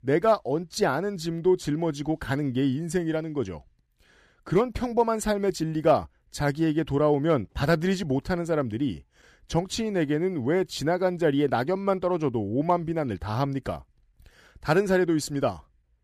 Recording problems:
none

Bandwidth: 15 kHz